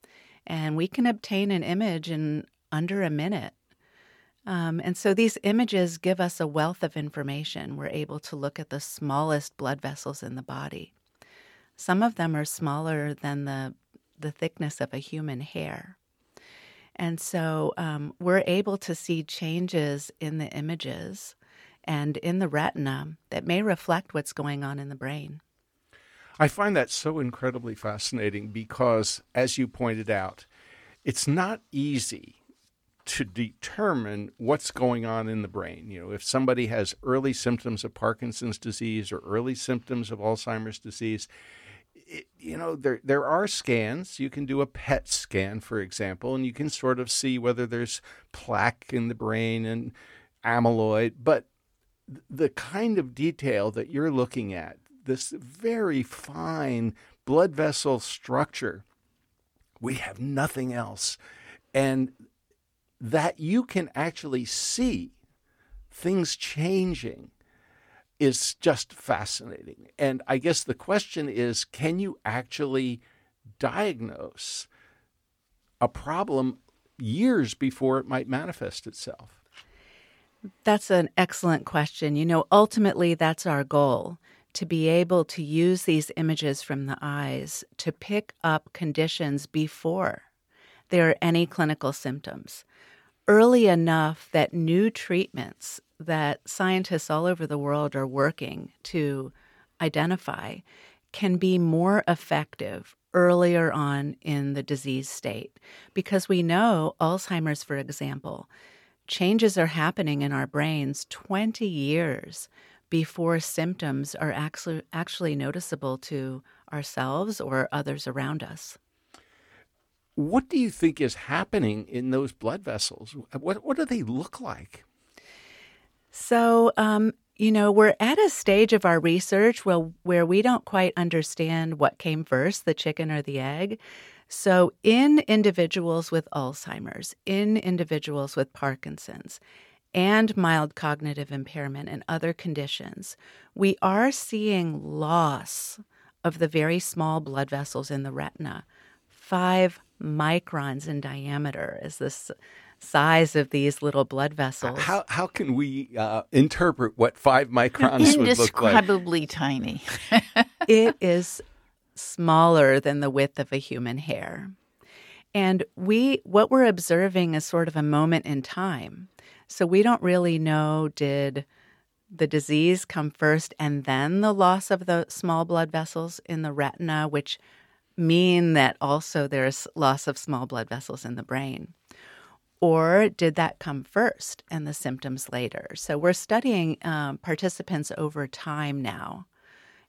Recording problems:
none

